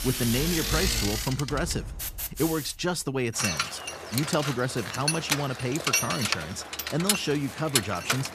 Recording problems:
machinery noise; very loud; throughout; as loud as the speech

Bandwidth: 14.5 kHz